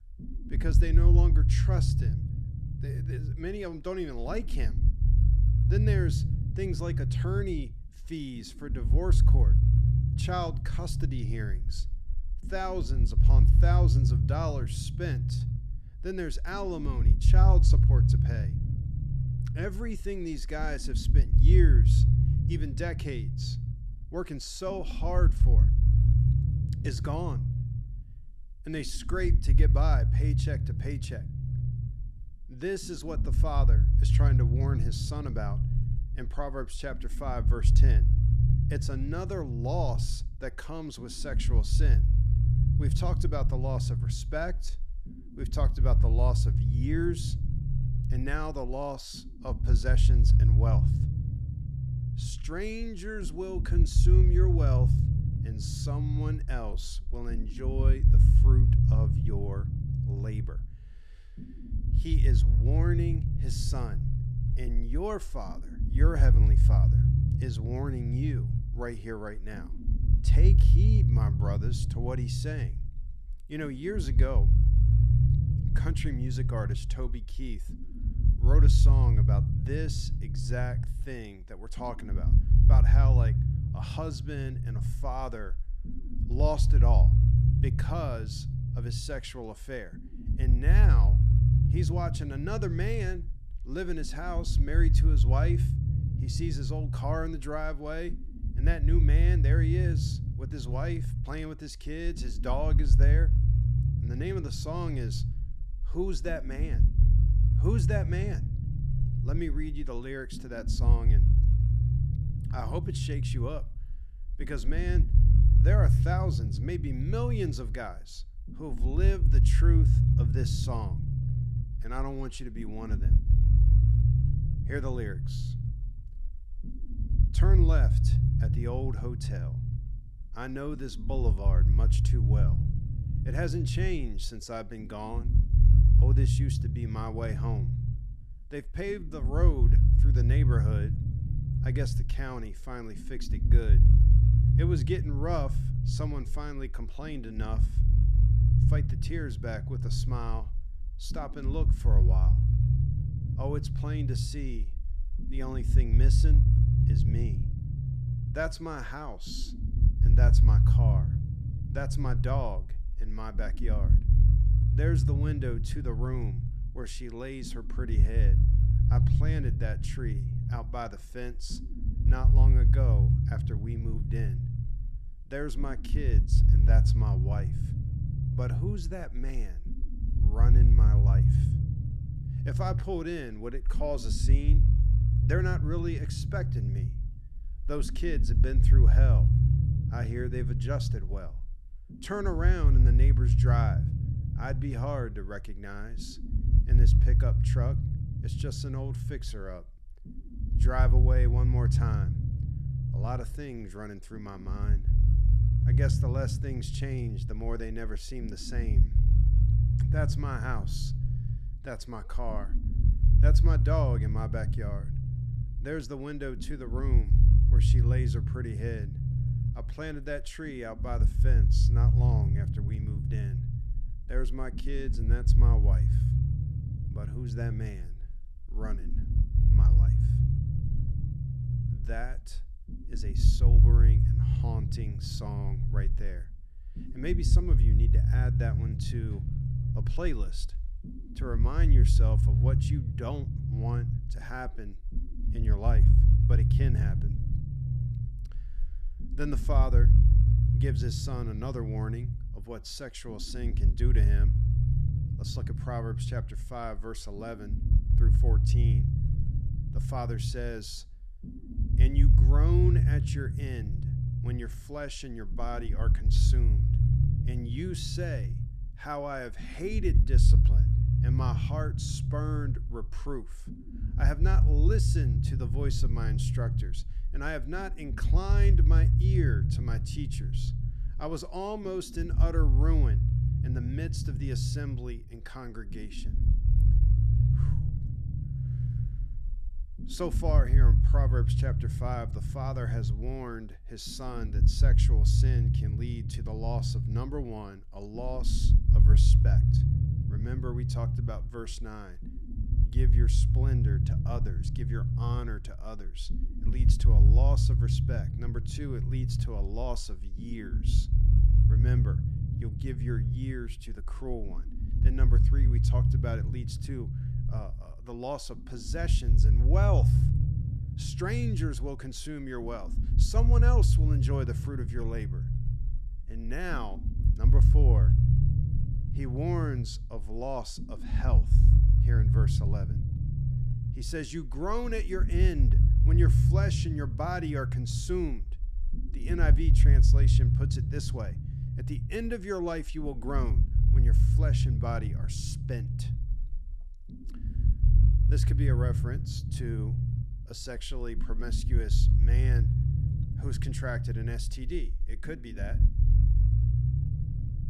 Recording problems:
low rumble; loud; throughout; 3 dB below the speech

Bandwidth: 13.5 kHz